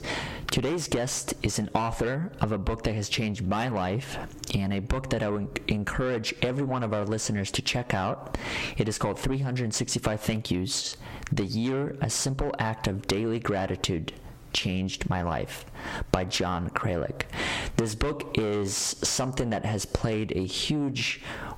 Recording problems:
distortion; heavy; 6 dB below the speech
squashed, flat; somewhat

